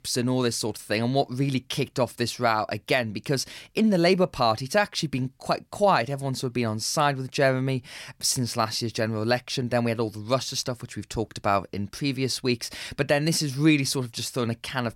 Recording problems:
none

